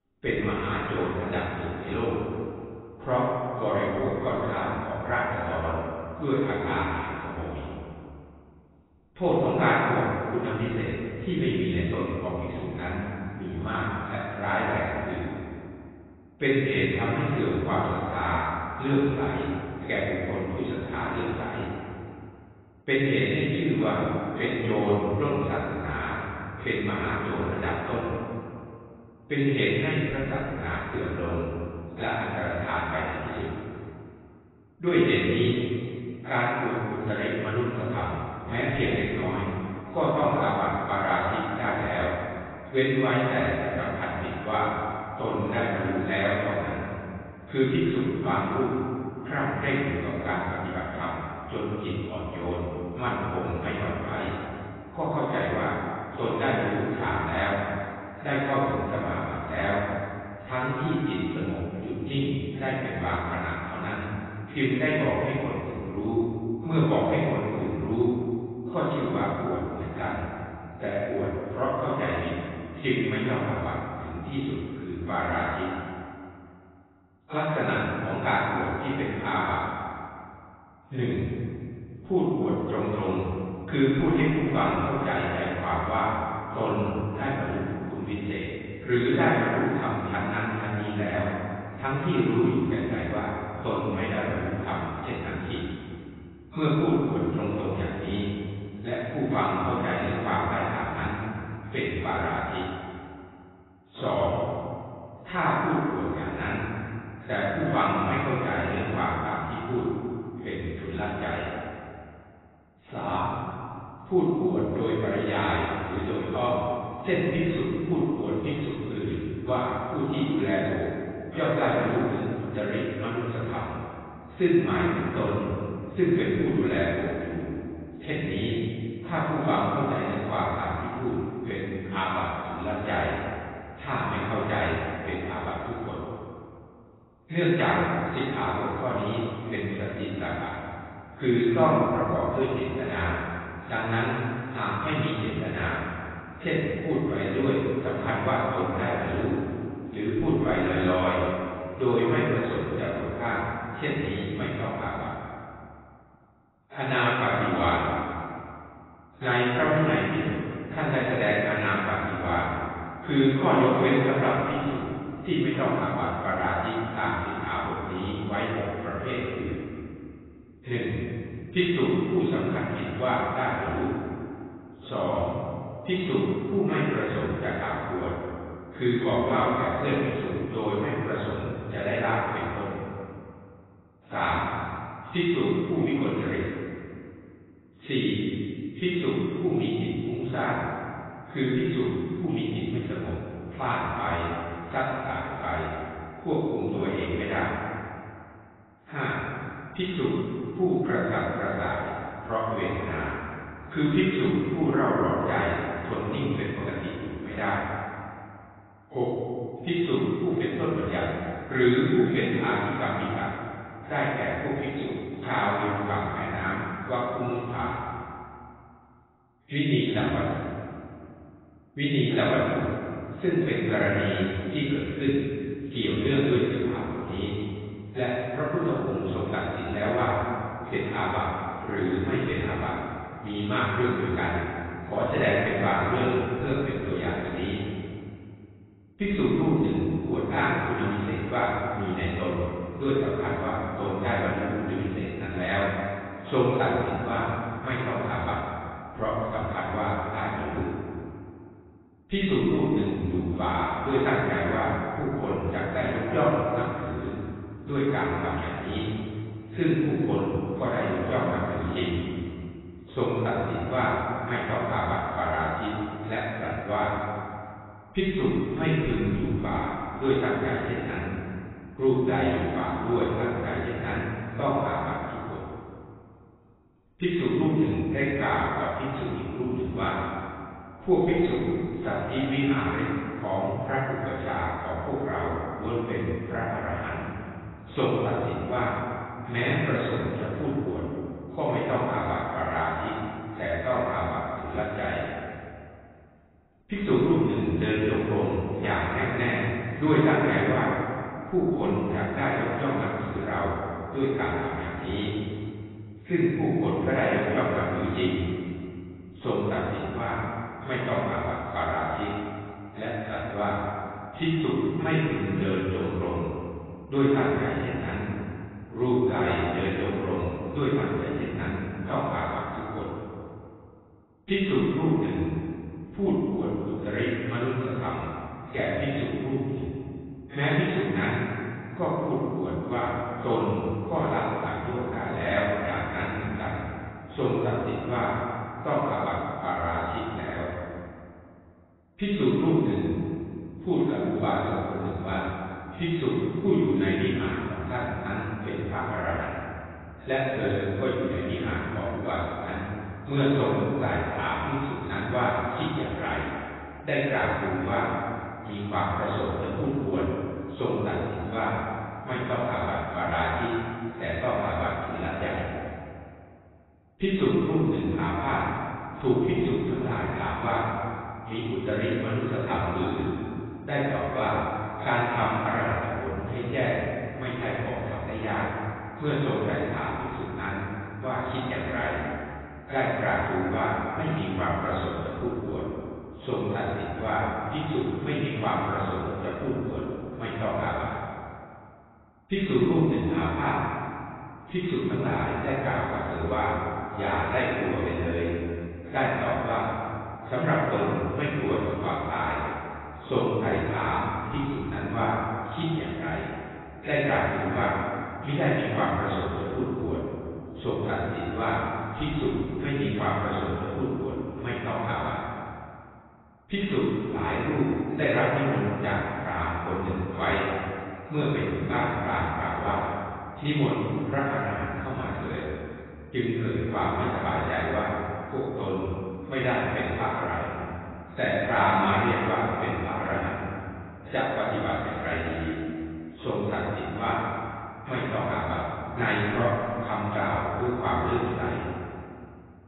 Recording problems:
room echo; strong; dies away in 2.2 s
off-mic speech; far
garbled, watery; badly; nothing above 4 kHz

